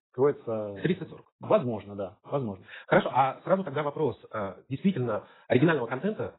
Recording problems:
garbled, watery; badly; nothing above 4 kHz
wrong speed, natural pitch; too fast; 1.6 times normal speed

